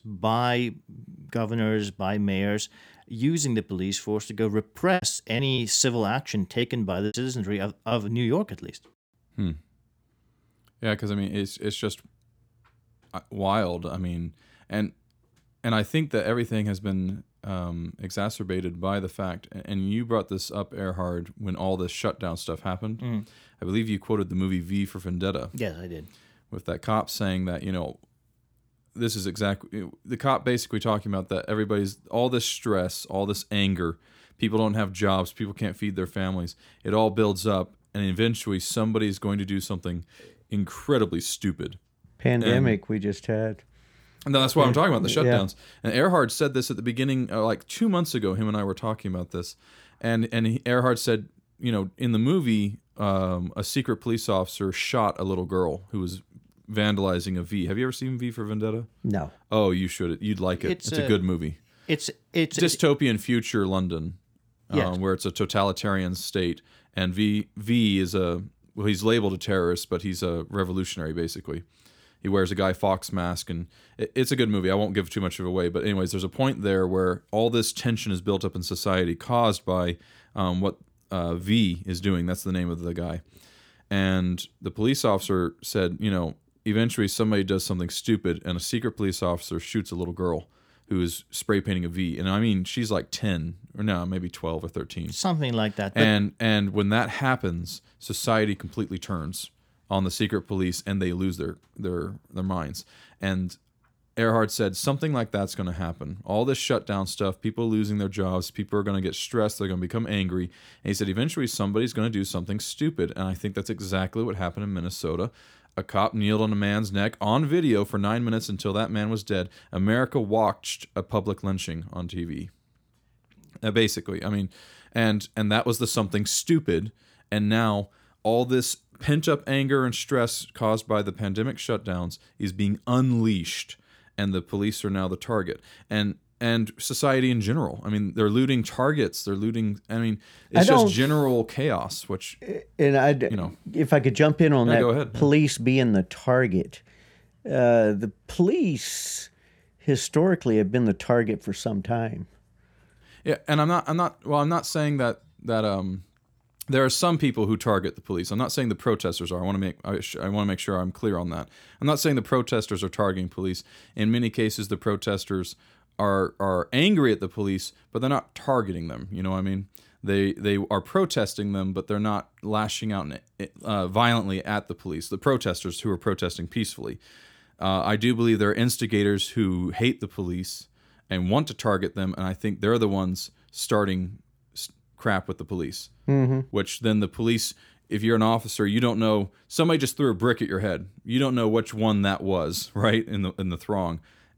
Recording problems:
choppy; very; from 5 to 8 s; 9% of the speech affected

